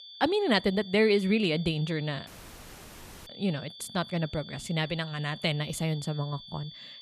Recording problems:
high-pitched whine; noticeable; throughout; 3.5 kHz, 15 dB below the speech
audio cutting out; at 2.5 s for 1 s

